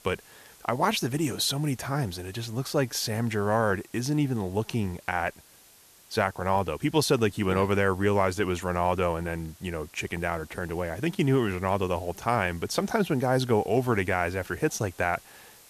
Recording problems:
hiss; faint; throughout; 25 dB below the speech

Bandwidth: 14 kHz